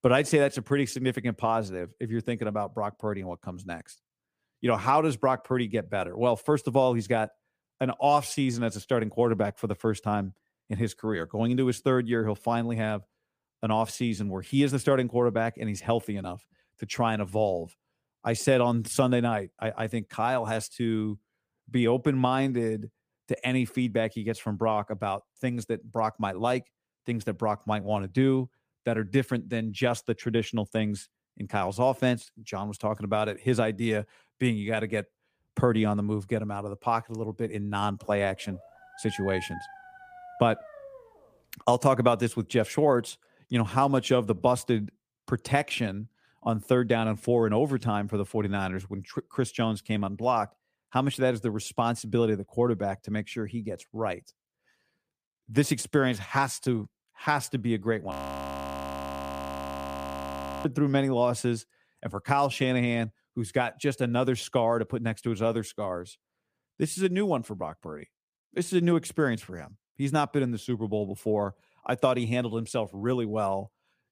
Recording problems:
dog barking; faint; from 38 to 41 s; peak 10 dB below the speech
audio freezing; at 58 s for 2.5 s

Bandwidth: 15 kHz